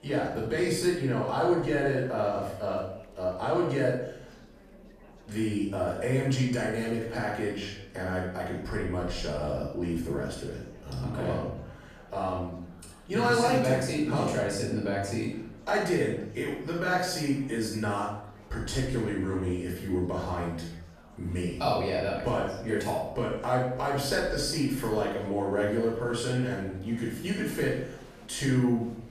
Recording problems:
off-mic speech; far
room echo; noticeable; dies away in 0.6 s
murmuring crowd; faint; throughout; 25 dB below the speech

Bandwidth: 14.5 kHz